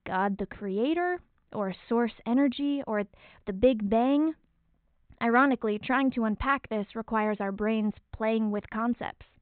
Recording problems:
high frequencies cut off; severe; nothing above 4 kHz

